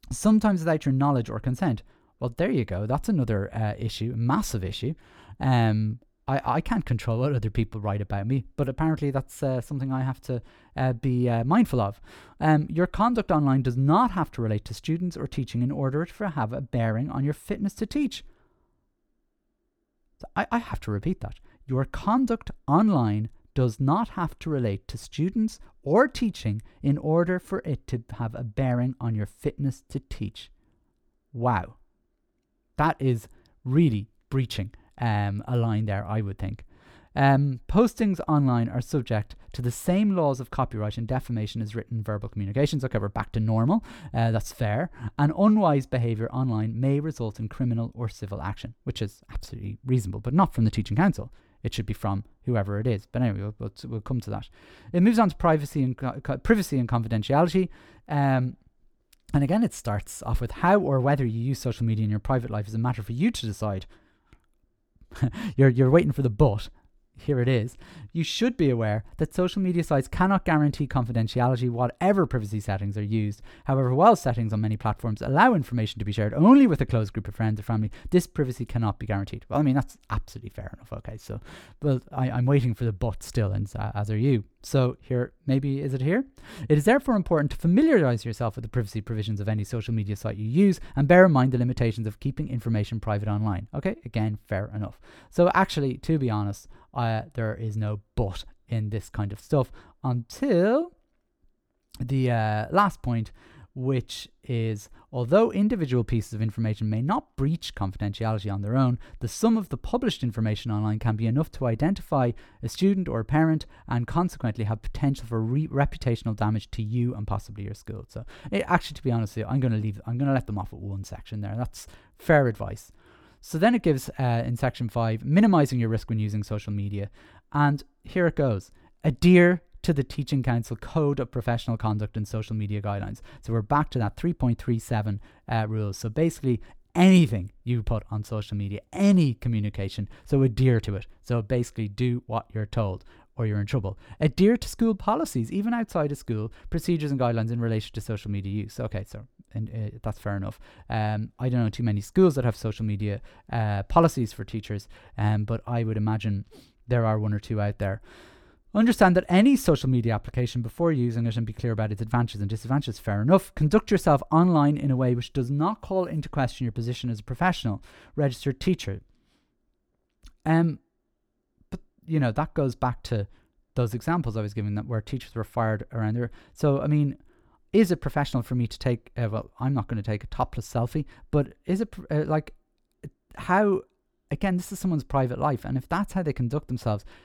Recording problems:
none

